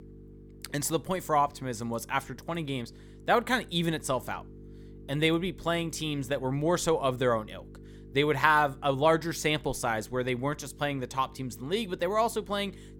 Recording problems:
electrical hum; faint; throughout; 50 Hz, 25 dB below the speech

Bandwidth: 17 kHz